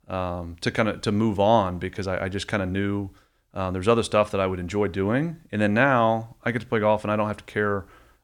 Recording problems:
none

